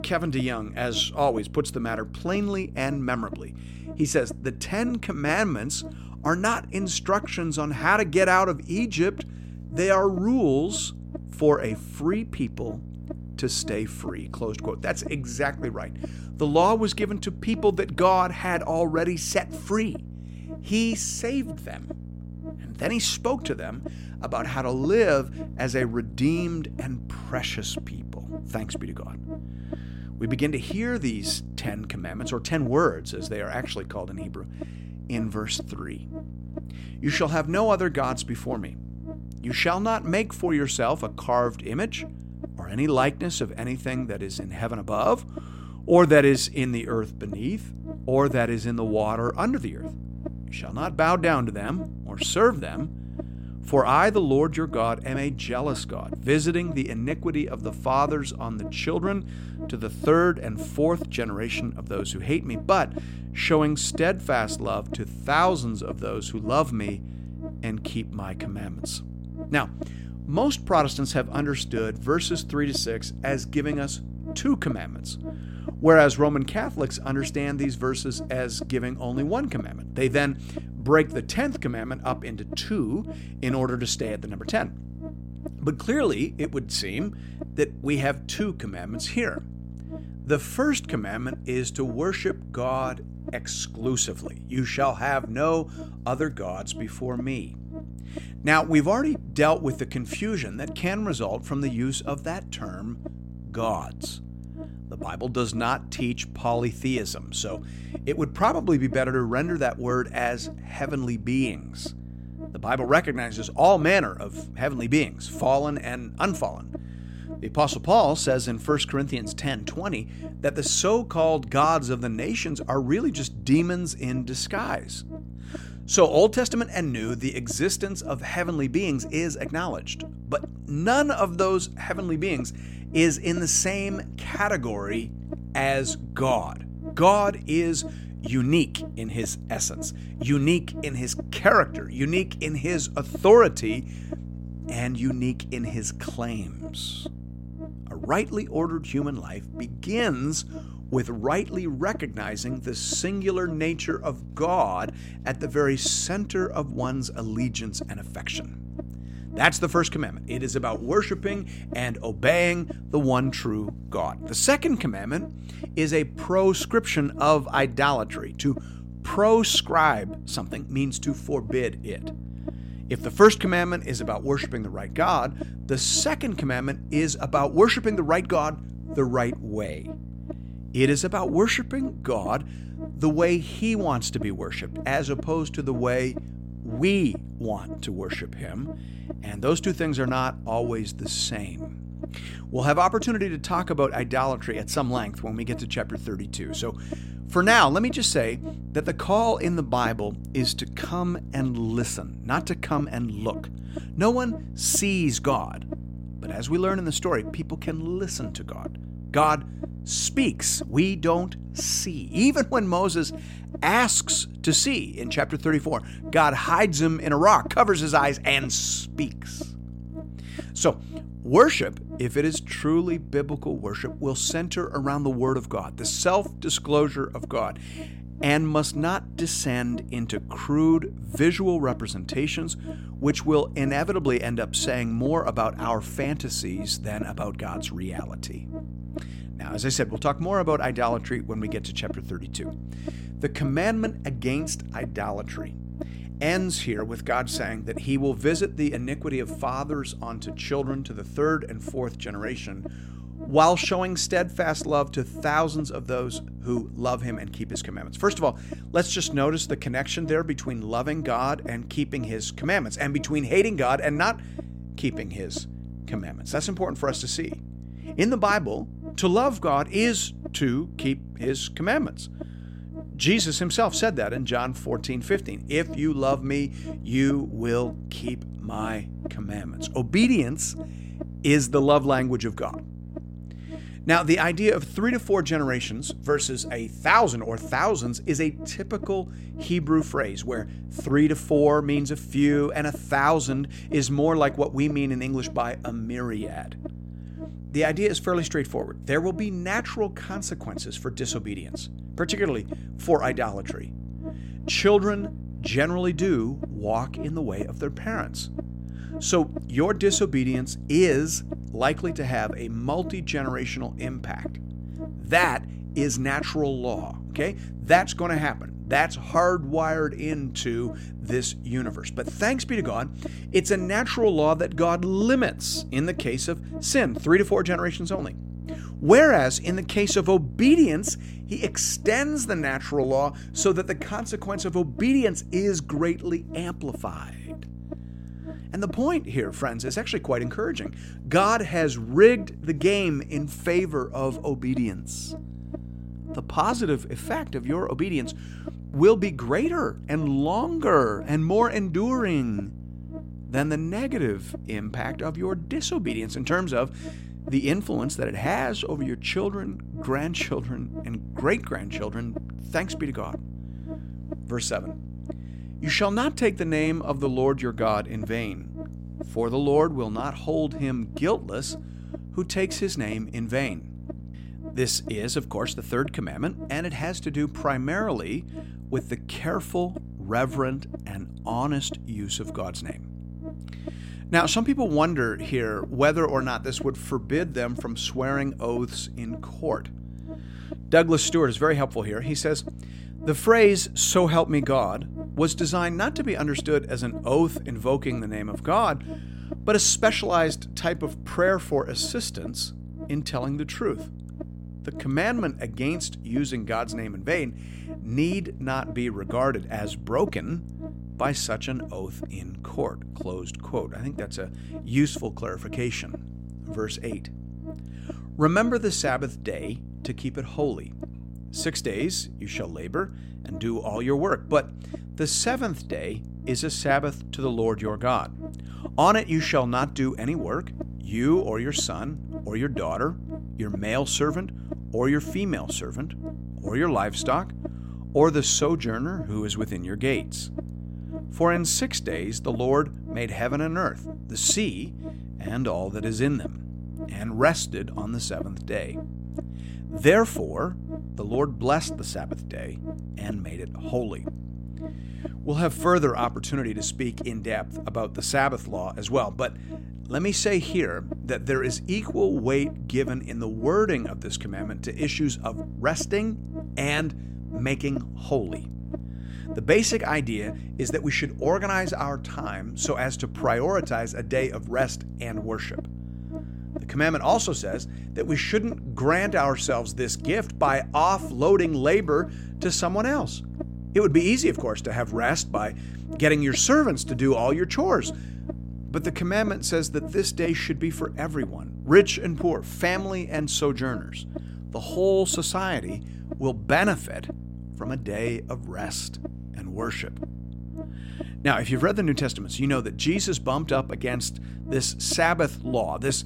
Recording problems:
electrical hum; noticeable; throughout; 60 Hz, 20 dB below the speech

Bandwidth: 16 kHz